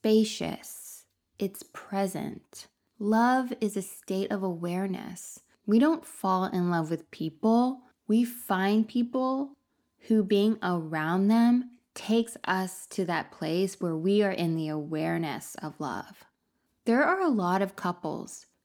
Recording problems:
none

